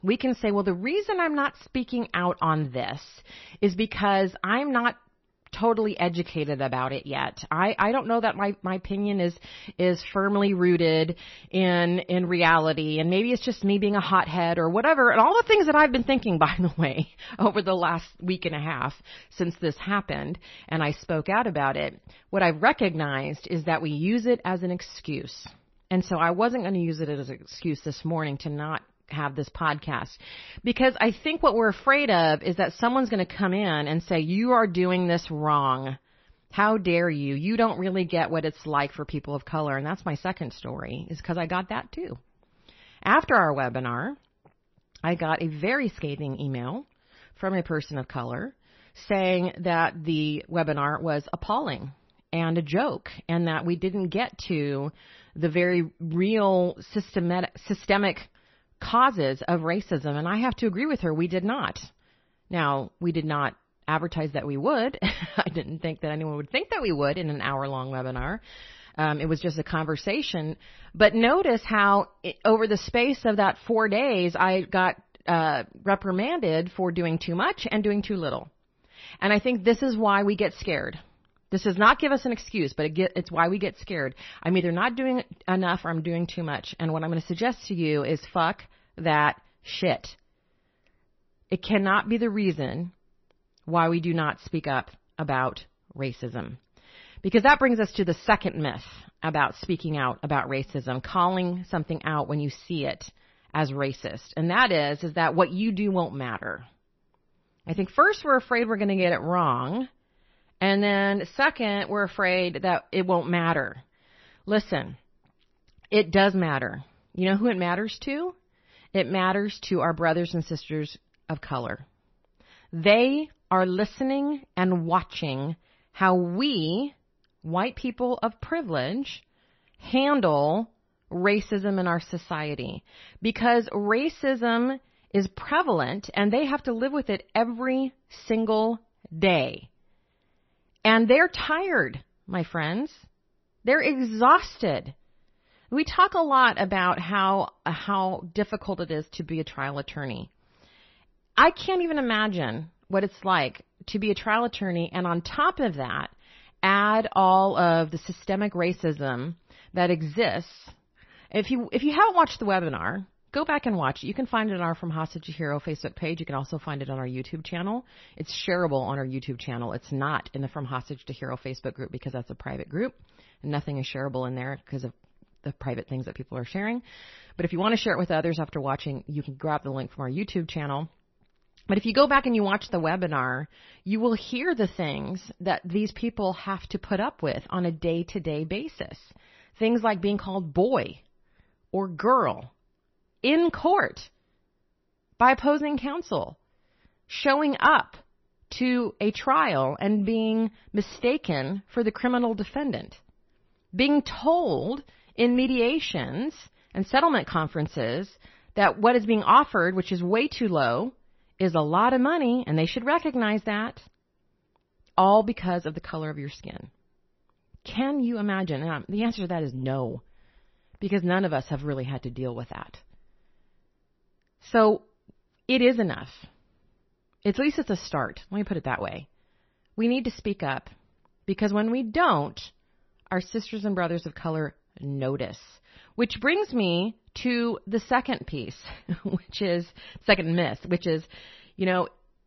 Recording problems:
garbled, watery; slightly; nothing above 6 kHz

